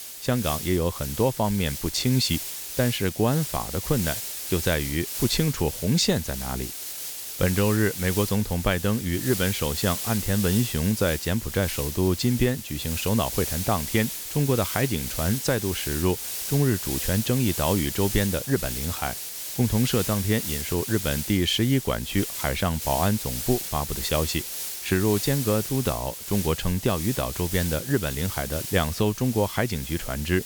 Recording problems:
hiss; loud; throughout; 5 dB below the speech

